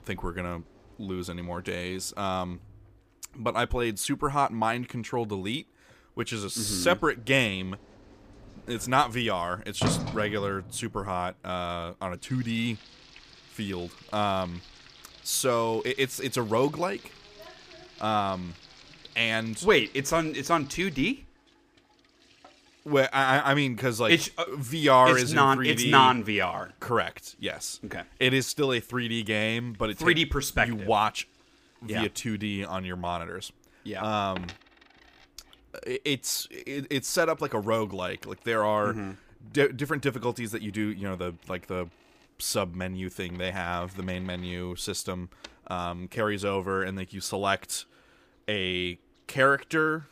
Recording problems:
household noises; noticeable; throughout; 15 dB below the speech

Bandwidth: 15 kHz